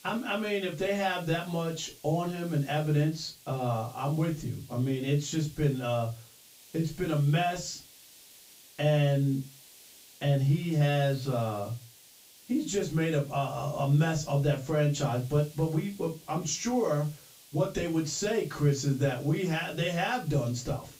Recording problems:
off-mic speech; far
high frequencies cut off; noticeable; nothing above 7.5 kHz
room echo; very slight; dies away in 0.2 s
hiss; faint; throughout; 20 dB below the speech

